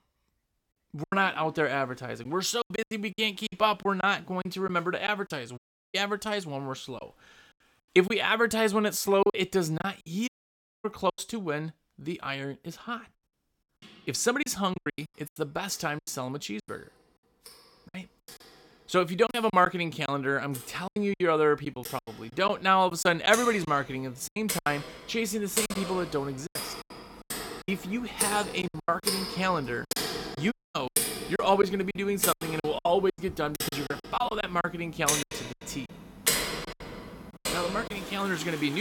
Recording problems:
household noises; loud; throughout; 5 dB below the speech
choppy; very; 11% of the speech affected
audio cutting out; at 5.5 s, at 10 s for 0.5 s and at 31 s
abrupt cut into speech; at the end

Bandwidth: 17 kHz